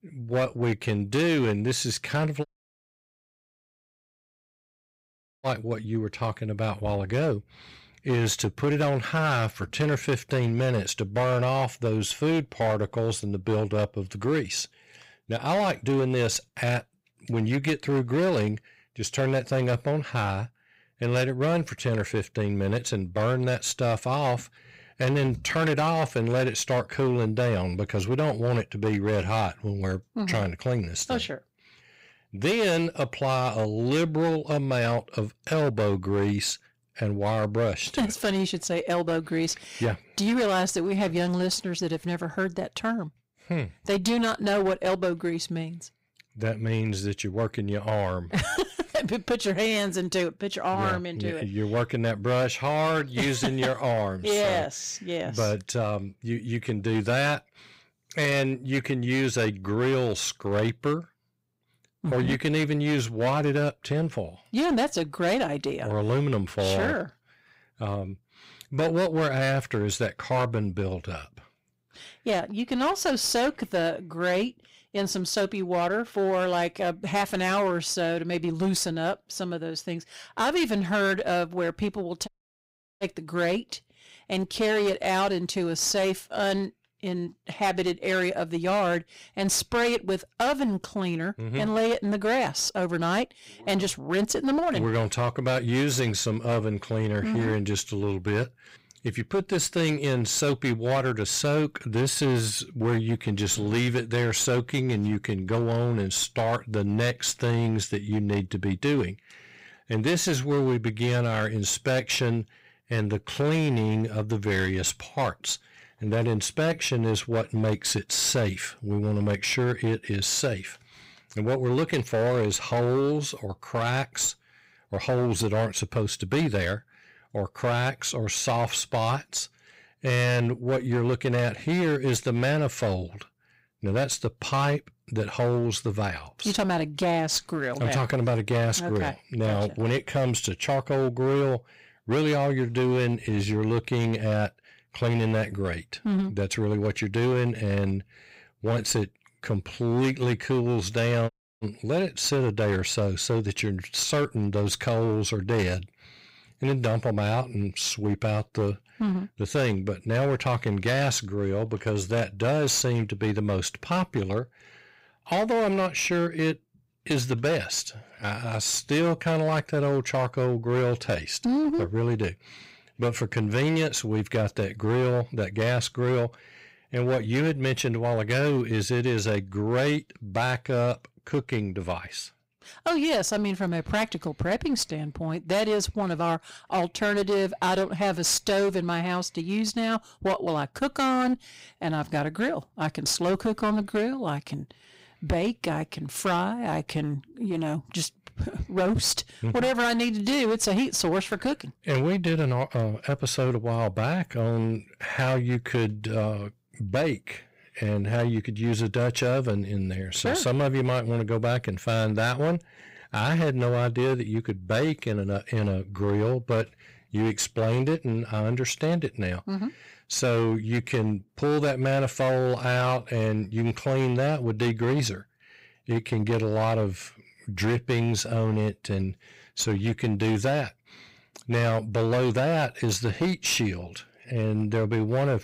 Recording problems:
distortion; slight; 14% of the sound clipped
audio cutting out; at 2.5 s for 3 s, at 1:22 for 0.5 s and at 2:31

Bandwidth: 15.5 kHz